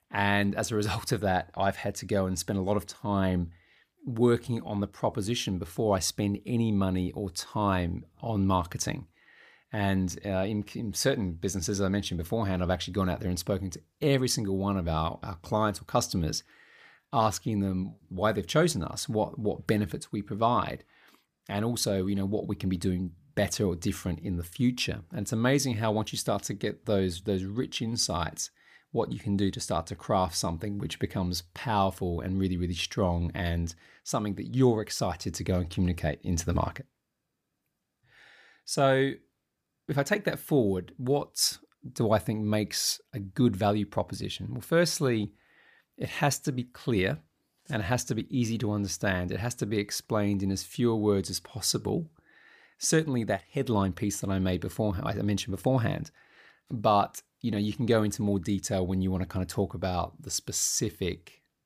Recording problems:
none

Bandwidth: 15 kHz